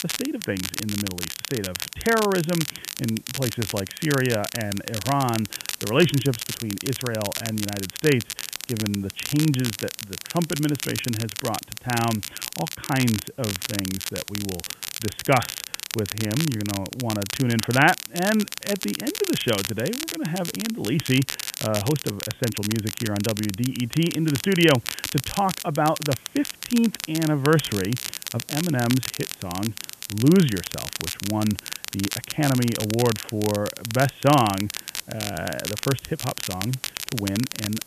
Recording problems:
high frequencies cut off; severe; nothing above 3.5 kHz
crackle, like an old record; loud; 6 dB below the speech
hiss; faint; throughout; 25 dB below the speech

